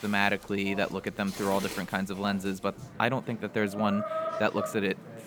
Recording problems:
animal sounds; loud; throughout; 7 dB below the speech
rain or running water; faint; throughout; 25 dB below the speech
background chatter; faint; throughout; 3 voices, 20 dB below the speech

